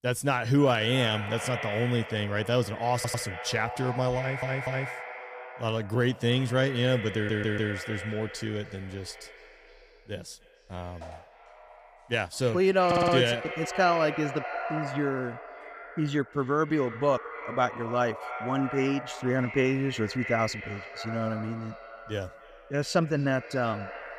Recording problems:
echo of what is said; strong; throughout; 290 ms later, 10 dB below the speech
audio stuttering; 4 times, first at 3 s

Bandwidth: 15 kHz